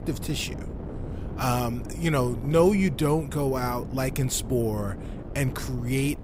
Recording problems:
wind noise on the microphone; occasional gusts; 15 dB below the speech

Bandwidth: 15.5 kHz